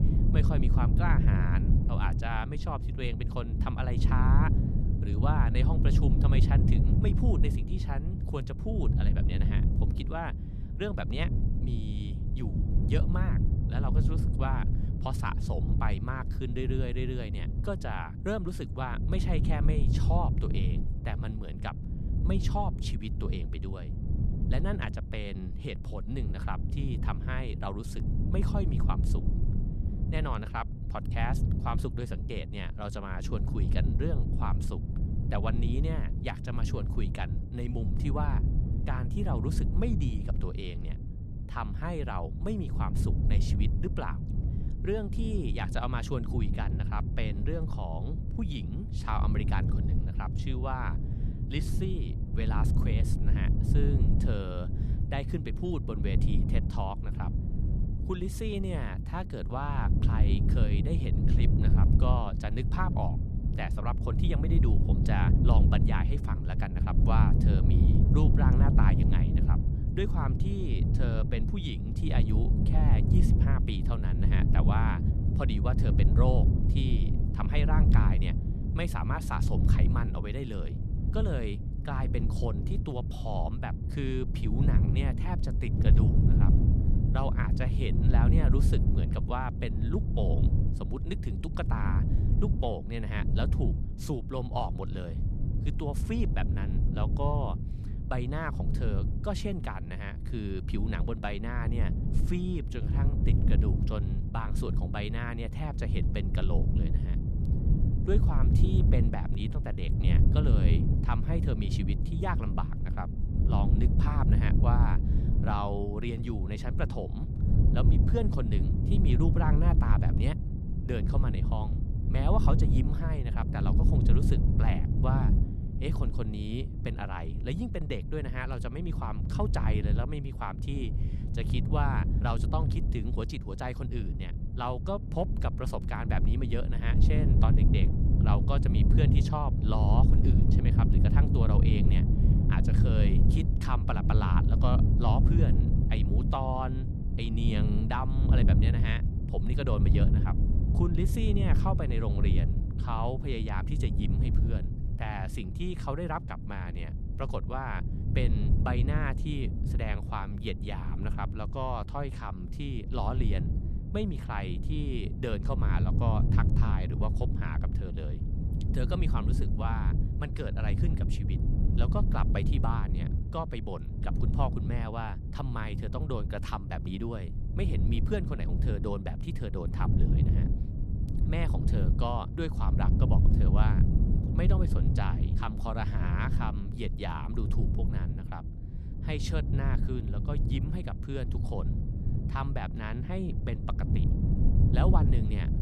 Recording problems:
wind noise on the microphone; heavy; 4 dB below the speech

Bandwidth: 14 kHz